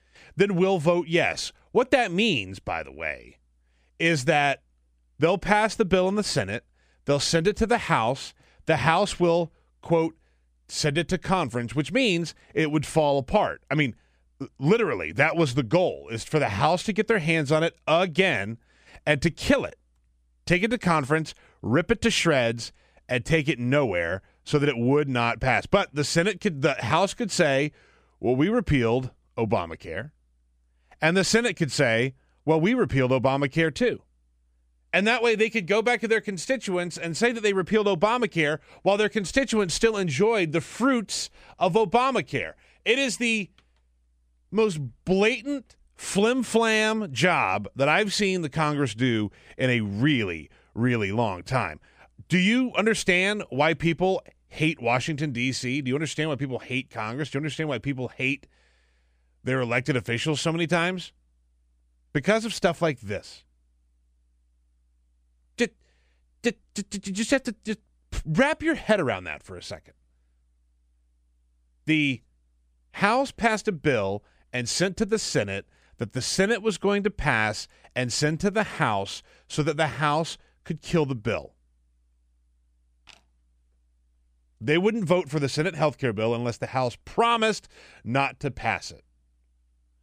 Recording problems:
none

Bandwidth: 15 kHz